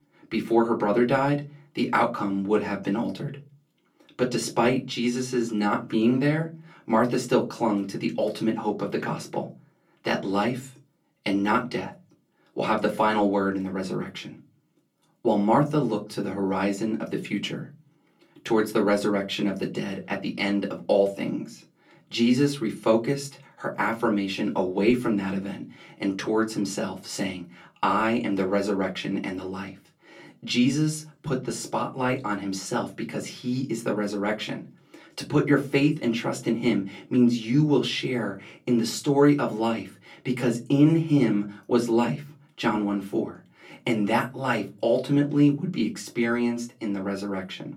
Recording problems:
off-mic speech; far
room echo; very slight; dies away in 0.2 s

